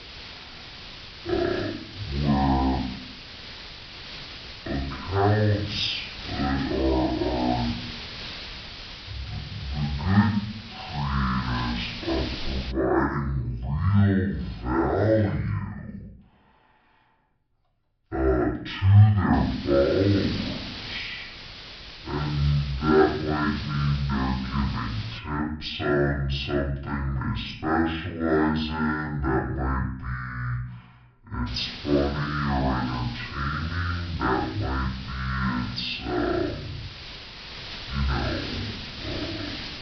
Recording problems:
off-mic speech; far
wrong speed and pitch; too slow and too low; 0.5 times normal speed
high frequencies cut off; noticeable; nothing above 5.5 kHz
room echo; slight; dies away in 0.6 s
hiss; noticeable; until 13 s, from 19 to 25 s and from 31 s on; 10 dB below the speech

